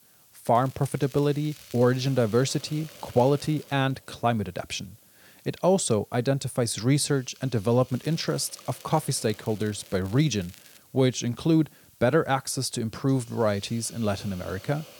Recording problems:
hiss; faint; throughout; 25 dB below the speech
crackling; faint; from 0.5 to 3.5 s and from 8 to 11 s; 25 dB below the speech

